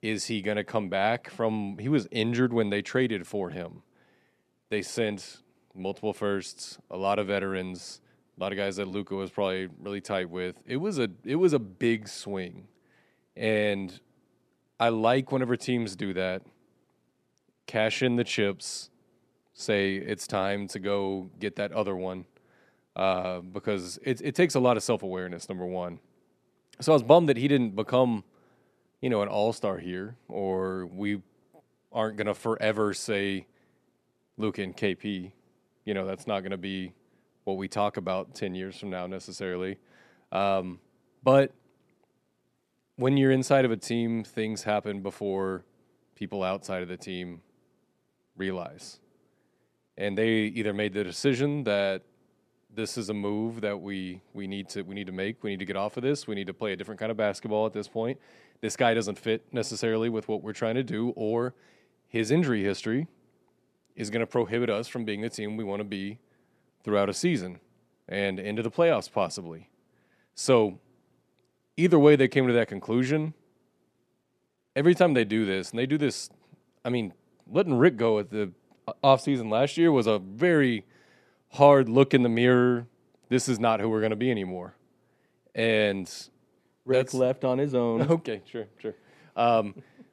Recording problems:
none

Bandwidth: 13.5 kHz